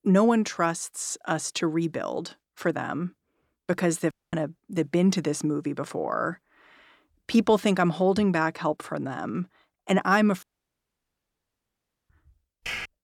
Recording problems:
audio cutting out; at 4 s and at 10 s for 1.5 s
keyboard typing; noticeable; at 13 s; peak 7 dB below the speech

